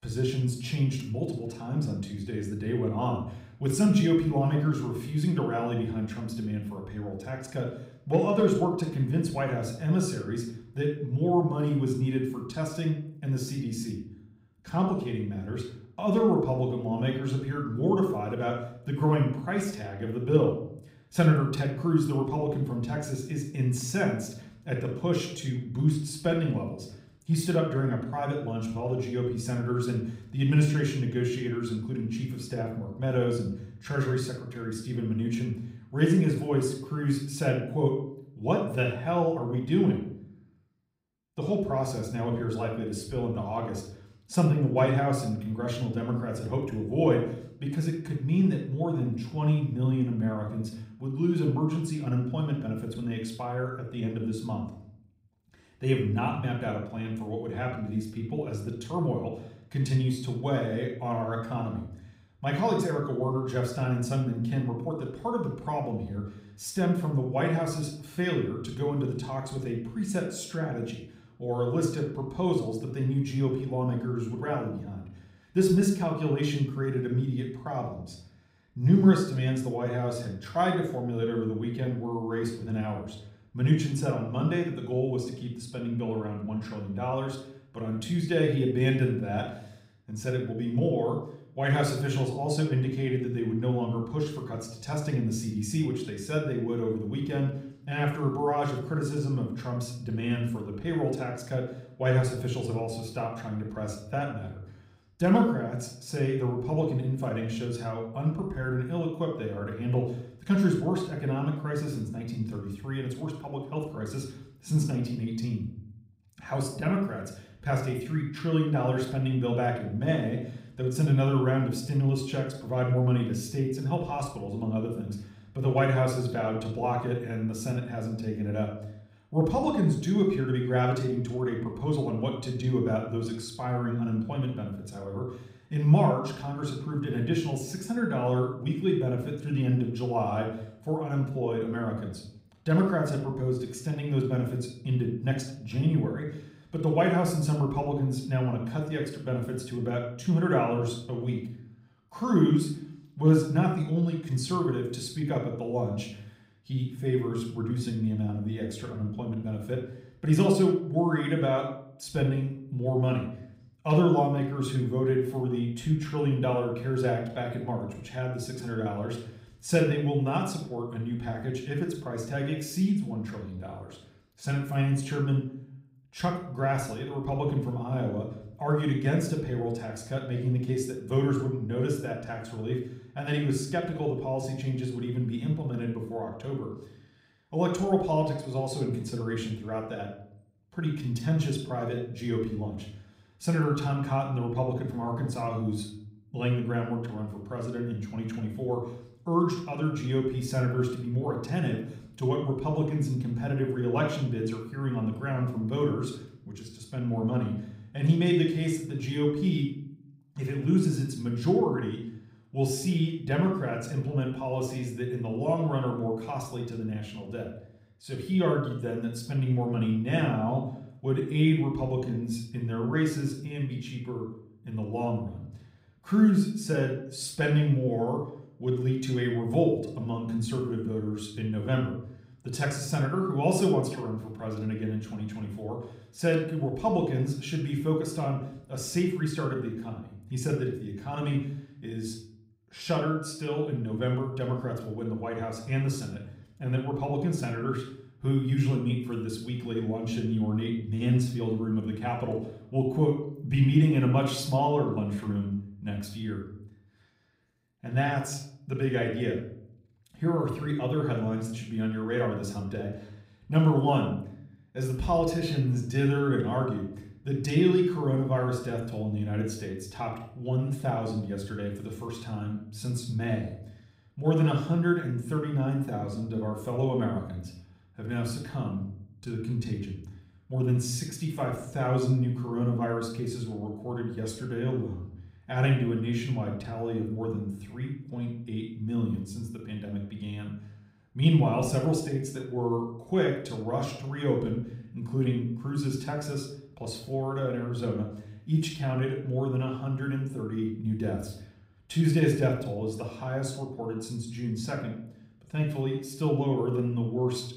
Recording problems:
room echo; slight; dies away in 0.6 s
off-mic speech; somewhat distant

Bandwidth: 15.5 kHz